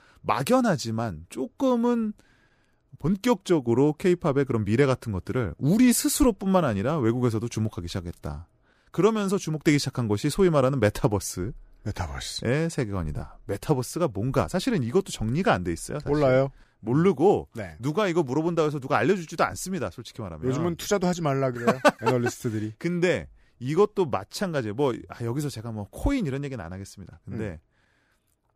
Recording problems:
none

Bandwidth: 15 kHz